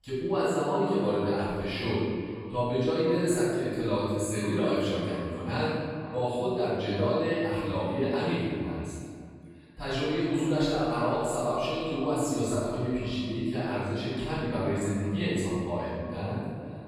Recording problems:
room echo; strong; dies away in 1.9 s
off-mic speech; far
echo of what is said; faint; throughout; 500 ms later, 20 dB below the speech

